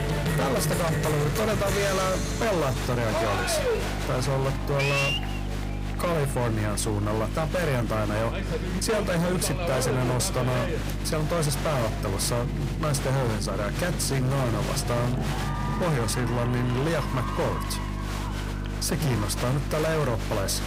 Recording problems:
distortion; heavy; 22% of the sound clipped
crowd noise; loud; throughout; 5 dB below the speech
electrical hum; noticeable; throughout; 50 Hz, 15 dB below the speech
background music; noticeable; throughout; 10 dB below the speech
chatter from many people; noticeable; throughout; 20 dB below the speech

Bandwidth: 15.5 kHz